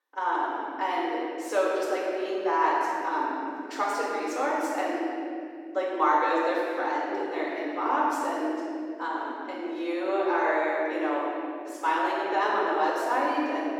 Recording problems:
room echo; strong; dies away in 2.1 s
off-mic speech; far
thin; somewhat; fading below 250 Hz

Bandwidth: 18 kHz